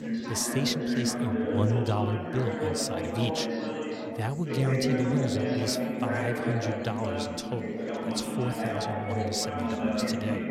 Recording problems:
chatter from many people; very loud; throughout; 1 dB above the speech

